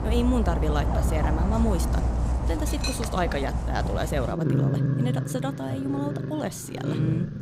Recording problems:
animal sounds; very loud; throughout; 3 dB above the speech

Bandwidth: 15.5 kHz